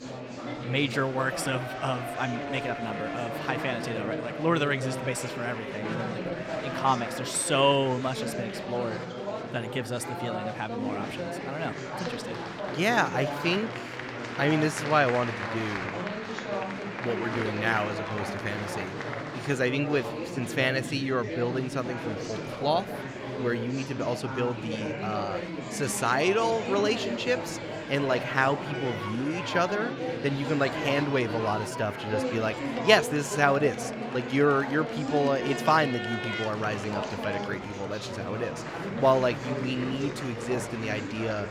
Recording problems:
murmuring crowd; loud; throughout; 5 dB below the speech

